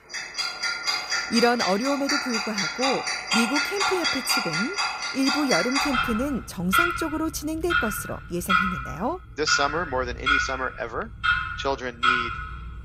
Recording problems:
household noises; very loud; throughout; 3 dB above the speech

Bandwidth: 15.5 kHz